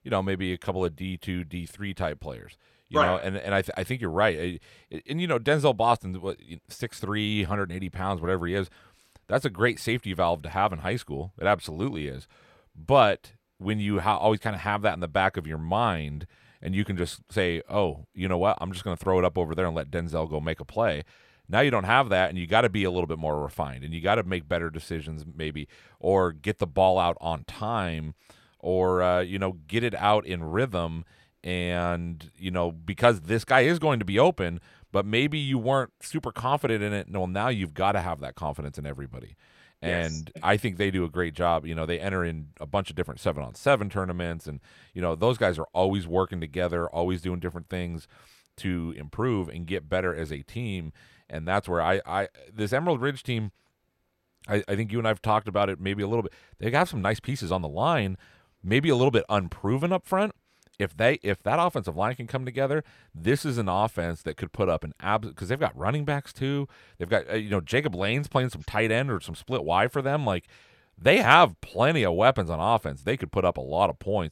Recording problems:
none

